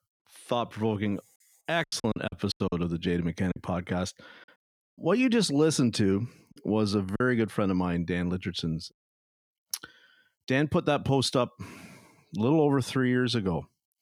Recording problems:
choppy; very; from 2 to 3.5 s and at 6.5 s; 9% of the speech affected

